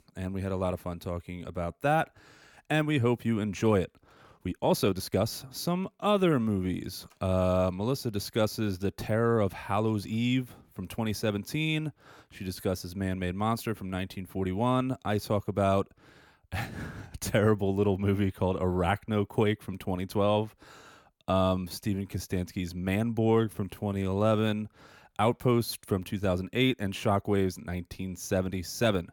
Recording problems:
uneven, jittery; strongly; from 4 to 24 s

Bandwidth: 18 kHz